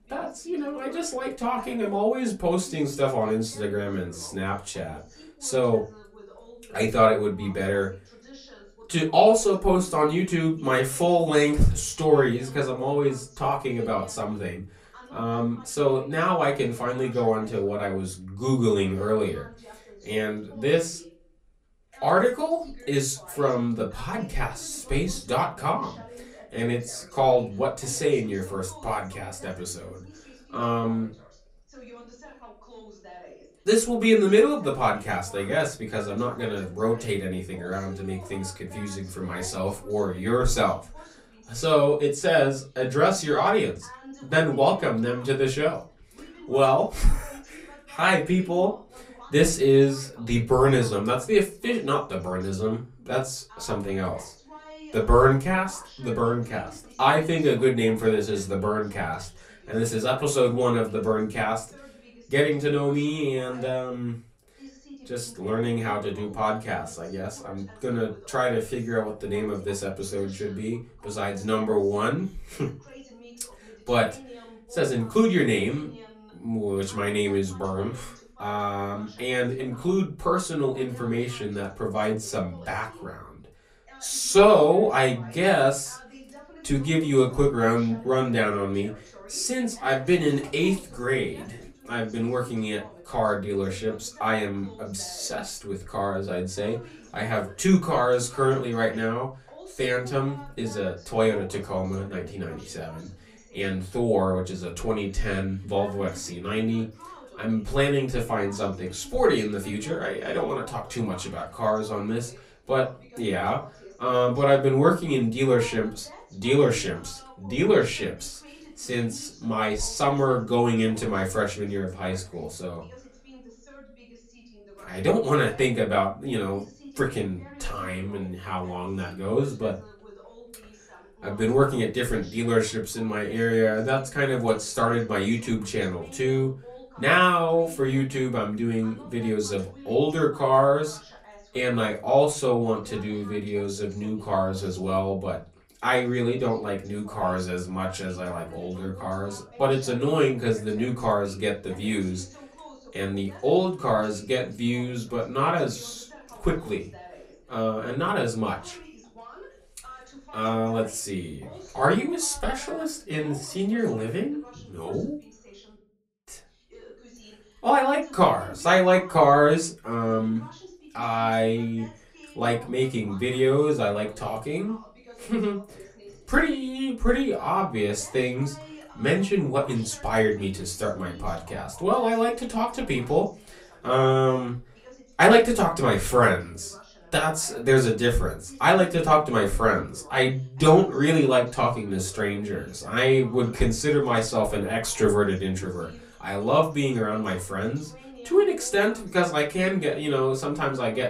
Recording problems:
off-mic speech; far
room echo; very slight; dies away in 0.2 s
voice in the background; faint; throughout; 25 dB below the speech

